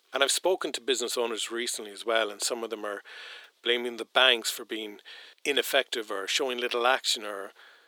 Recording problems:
thin; very; fading below 350 Hz

